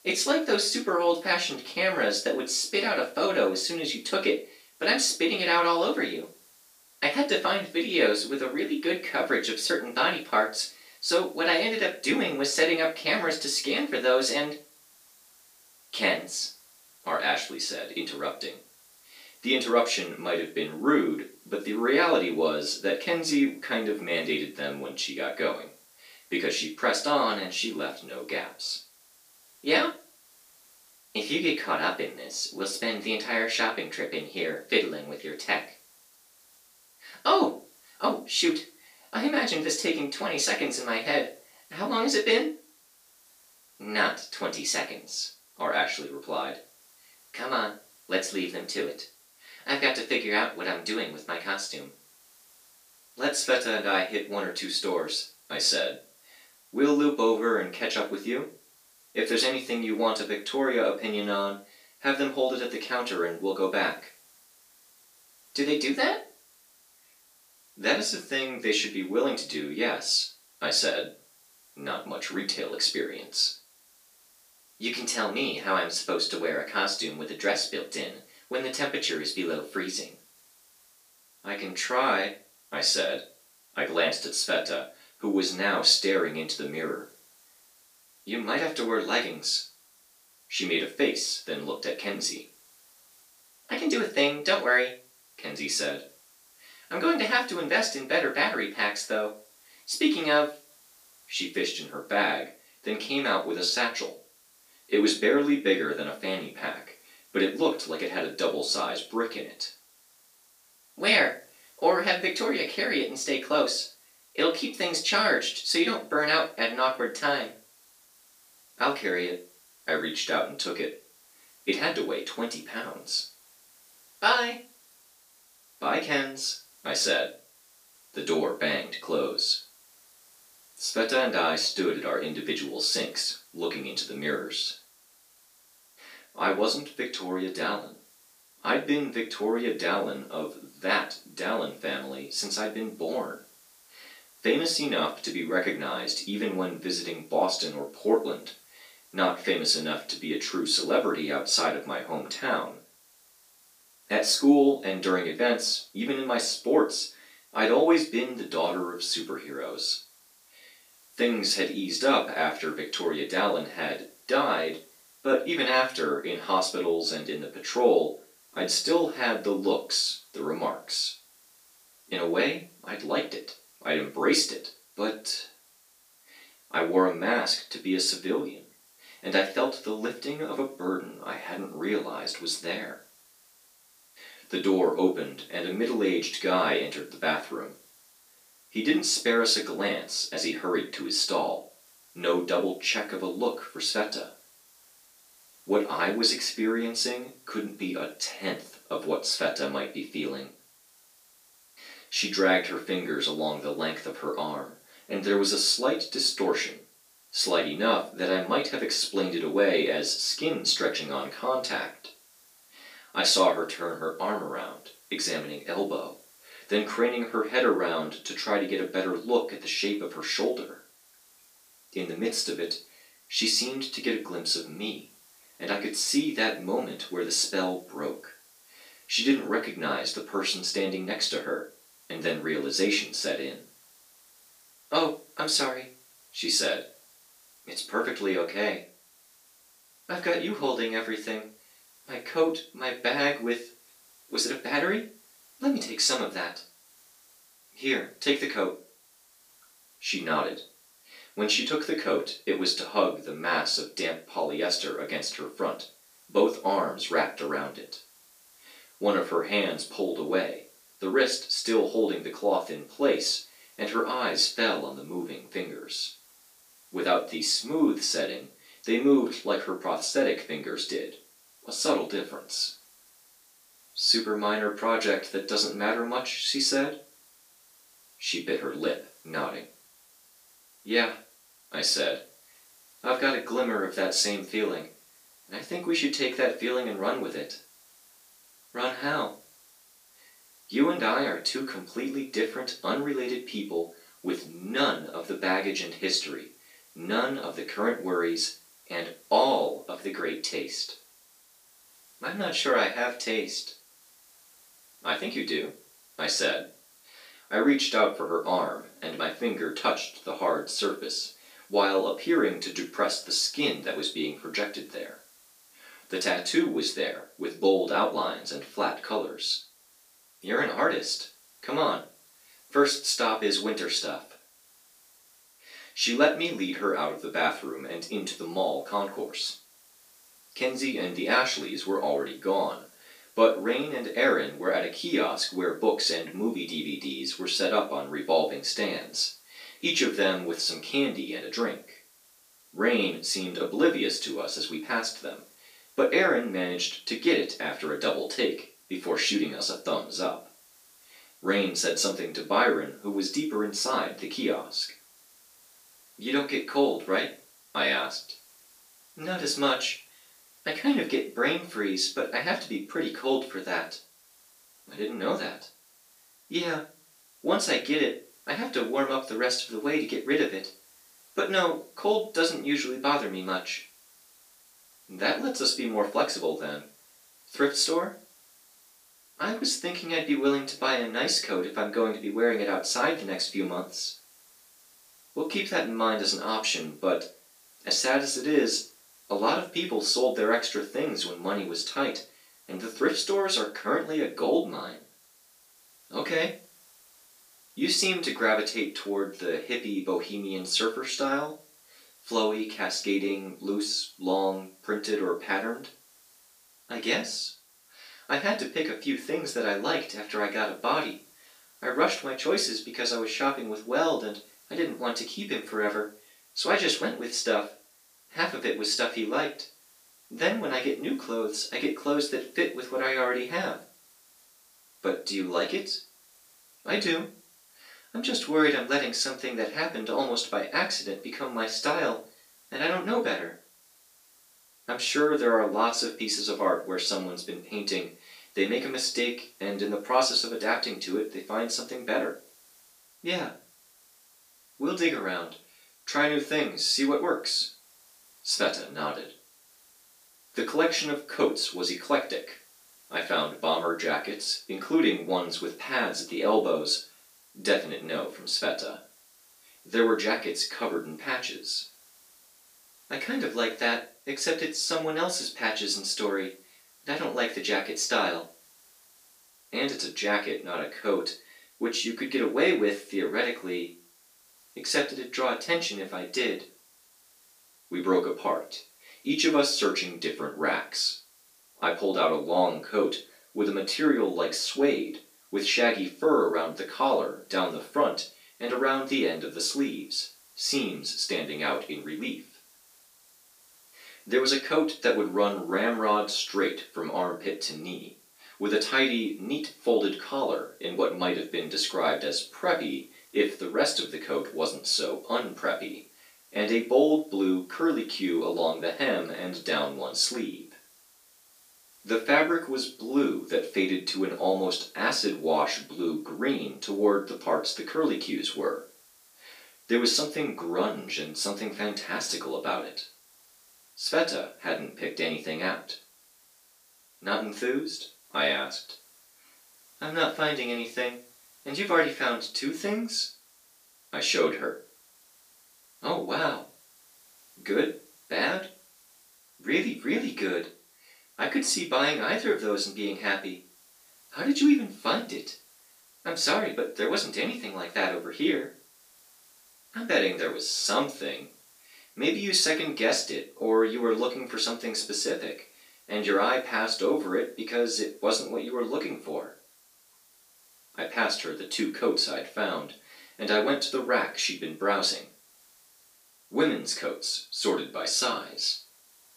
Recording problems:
off-mic speech; far
room echo; slight; dies away in 0.3 s
thin; very slightly; fading below 300 Hz
hiss; faint; throughout; 30 dB below the speech

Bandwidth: 15 kHz